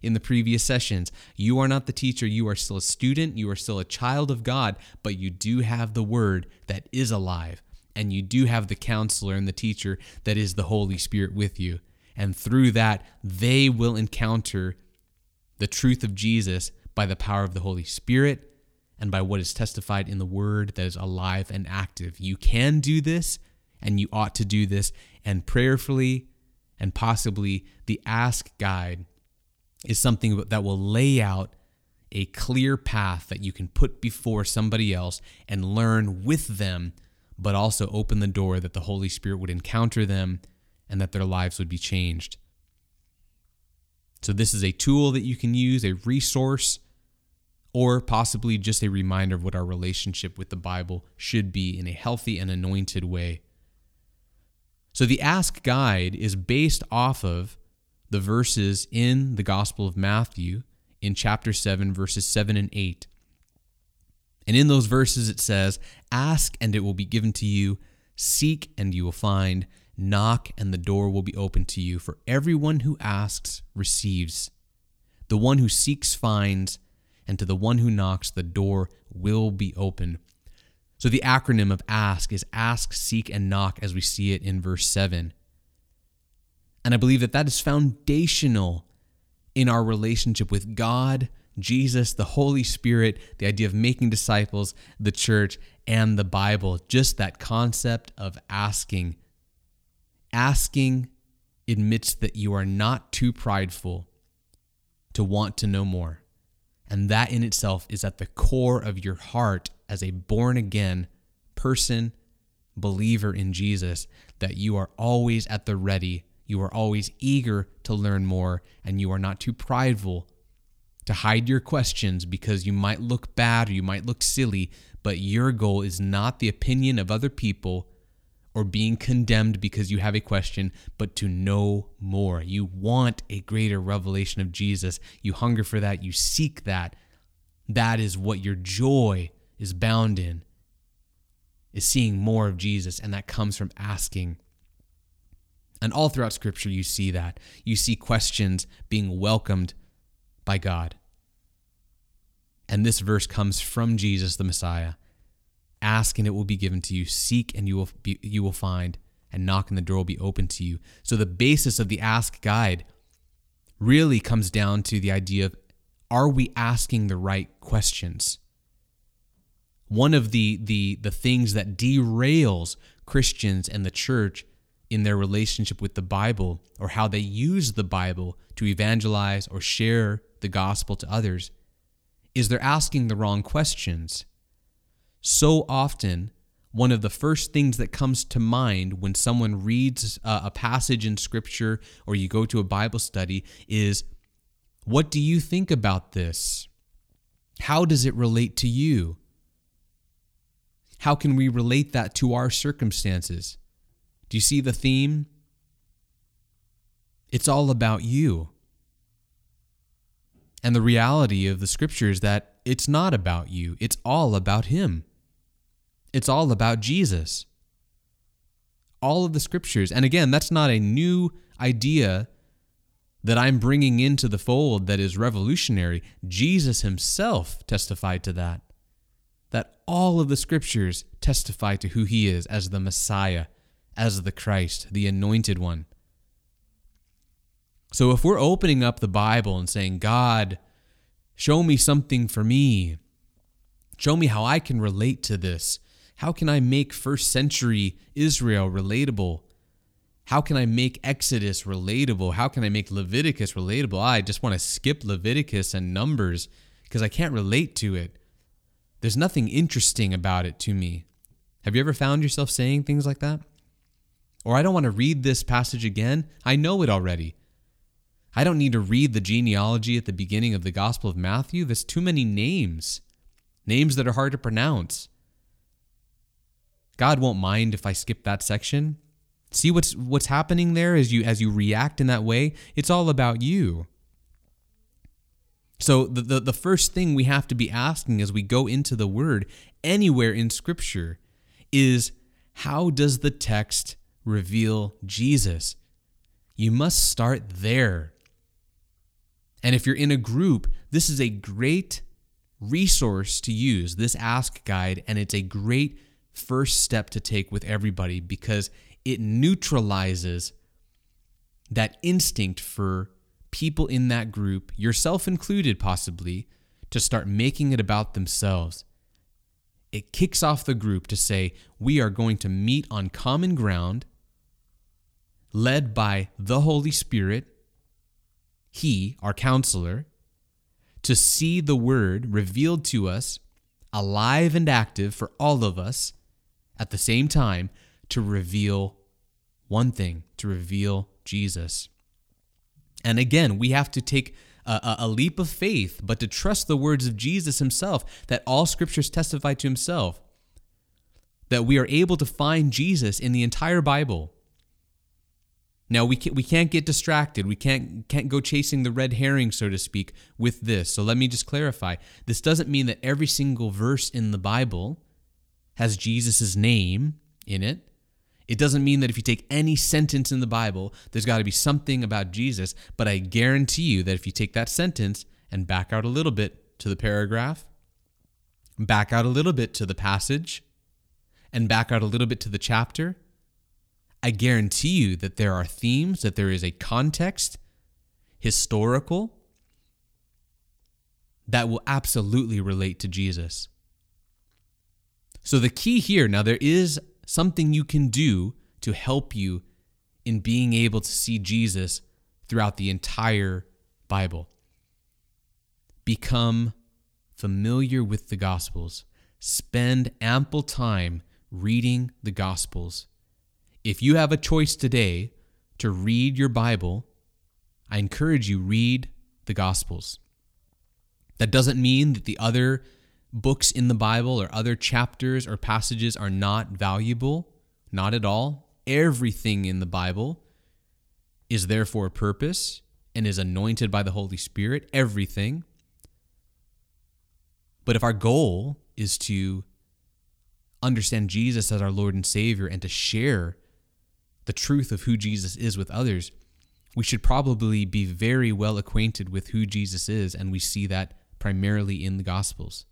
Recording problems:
none

